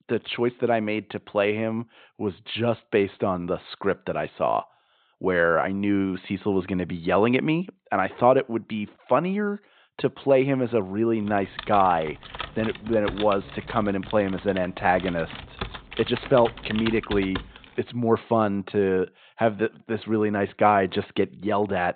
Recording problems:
high frequencies cut off; severe; nothing above 4 kHz
keyboard typing; noticeable; from 11 to 18 s; peak 8 dB below the speech

